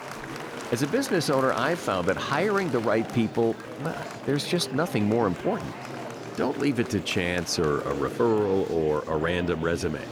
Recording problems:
murmuring crowd; noticeable; throughout; 10 dB below the speech

